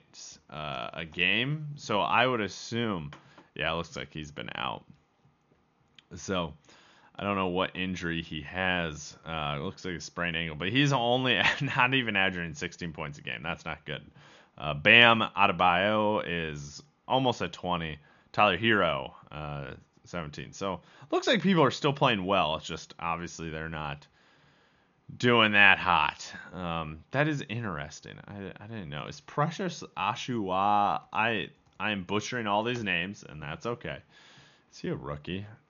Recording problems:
high frequencies cut off; noticeable; nothing above 7 kHz

